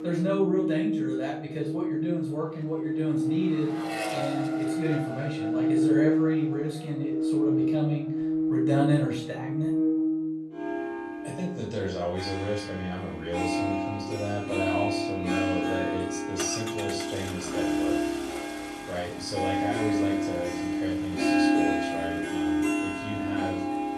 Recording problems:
off-mic speech; far
room echo; noticeable; dies away in 0.4 s
background music; very loud; throughout; 4 dB above the speech
traffic noise; loud; throughout; 8 dB below the speech

